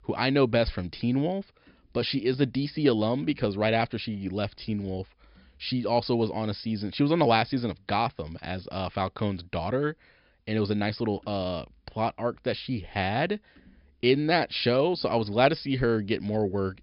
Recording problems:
high frequencies cut off; noticeable; nothing above 5.5 kHz

